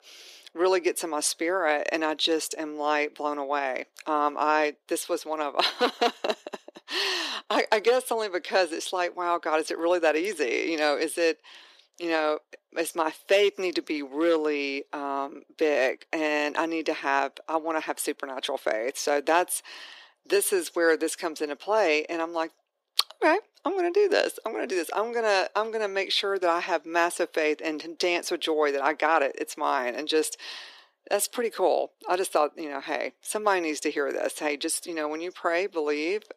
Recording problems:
thin; very; fading below 350 Hz

